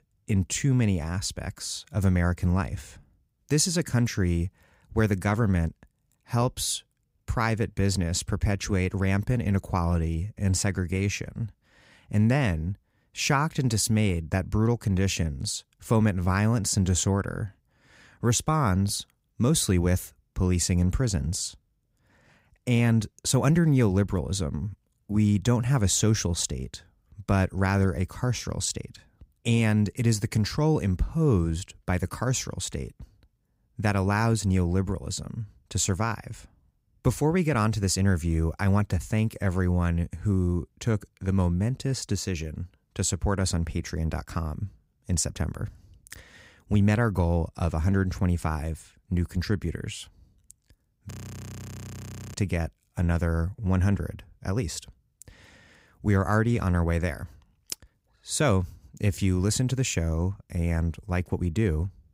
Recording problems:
audio freezing; at 51 s for 1 s

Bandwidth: 15.5 kHz